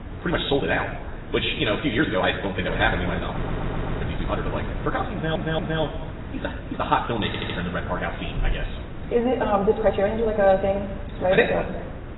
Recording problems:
garbled, watery; badly; nothing above 4 kHz
wrong speed, natural pitch; too fast; 1.8 times normal speed
room echo; slight; dies away in 0.9 s
off-mic speech; somewhat distant
wind noise on the microphone; occasional gusts; 15 dB below the speech
audio stuttering; at 3.5 s, at 5 s and at 7.5 s

